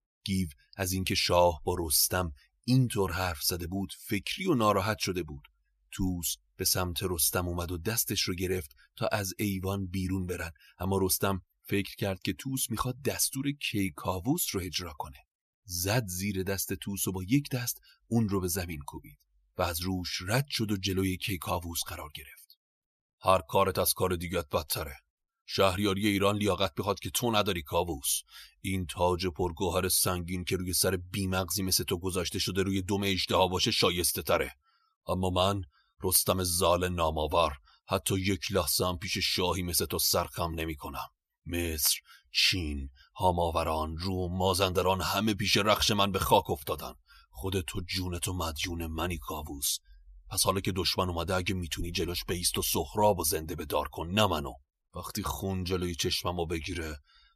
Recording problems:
none

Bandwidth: 14.5 kHz